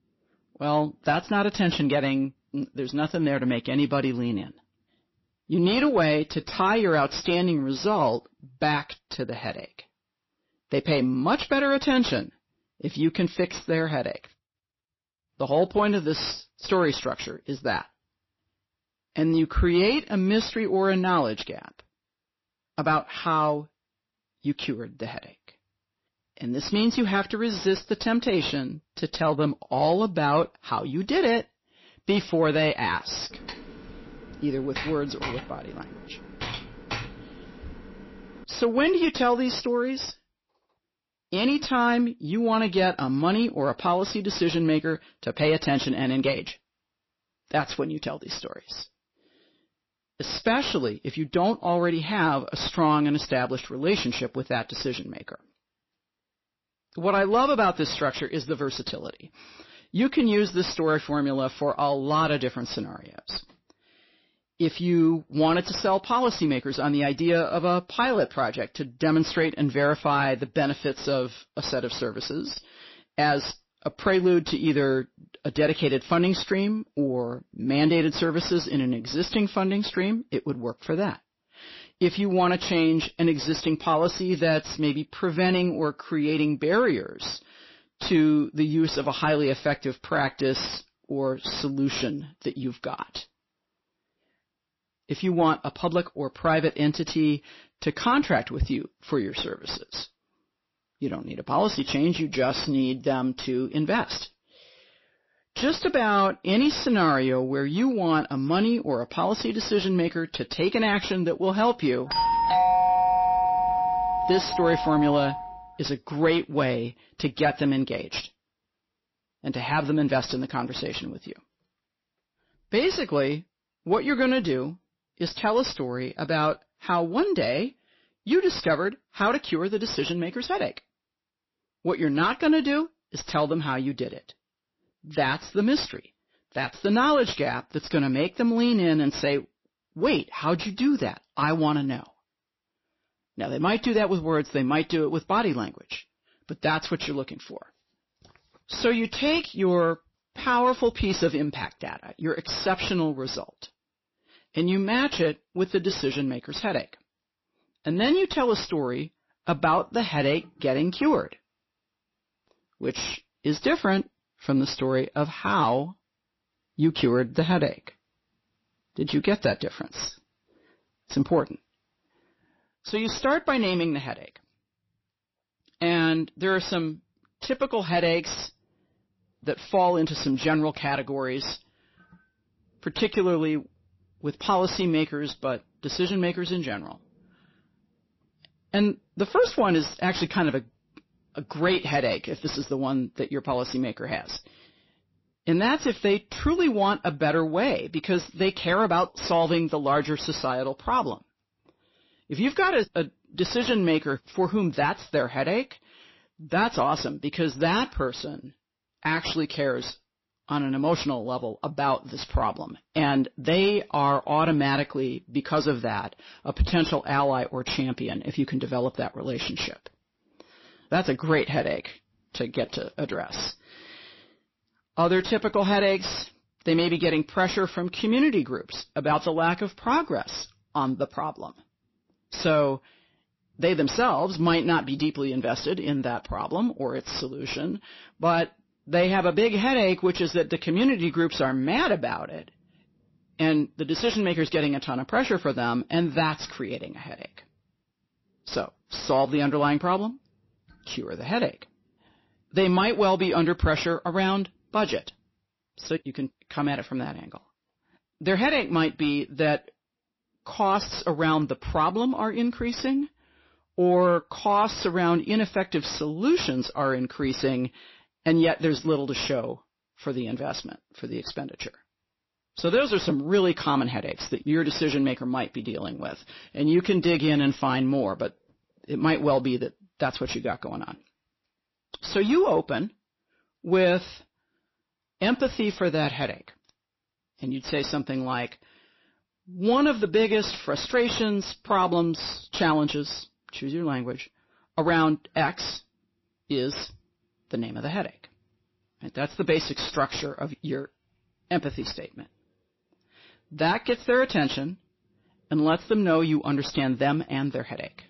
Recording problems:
distortion; slight; 10 dB below the speech
garbled, watery; slightly; nothing above 5.5 kHz
keyboard typing; noticeable; from 33 to 38 s; peak 8 dB below the speech
doorbell; loud; from 1:52 to 1:55; peak 6 dB above the speech

